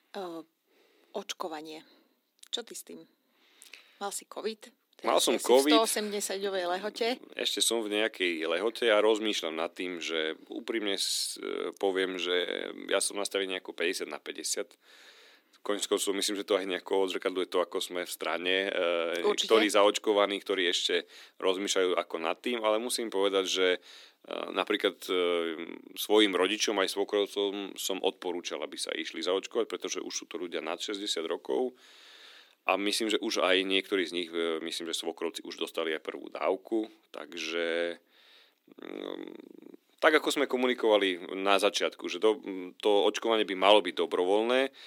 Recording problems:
thin; somewhat; fading below 250 Hz

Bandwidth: 17 kHz